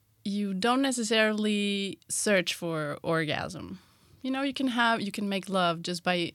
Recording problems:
none

